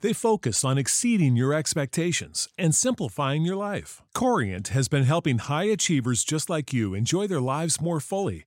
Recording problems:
none

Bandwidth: 16 kHz